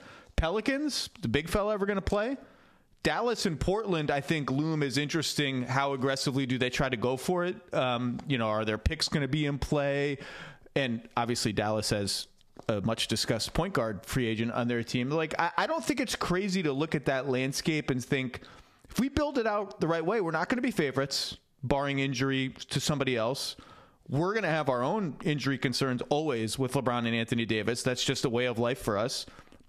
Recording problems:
squashed, flat; heavily

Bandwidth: 14.5 kHz